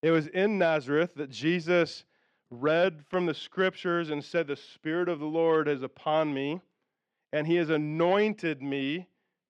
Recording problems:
muffled; very slightly; fading above 3 kHz

